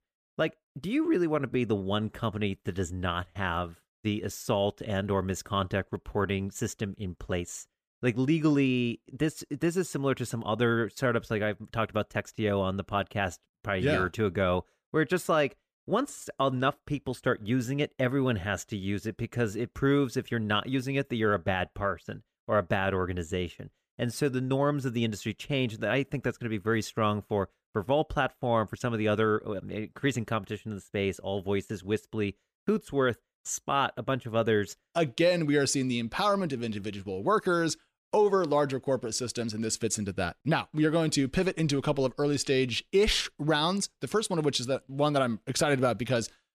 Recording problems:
none

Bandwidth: 14.5 kHz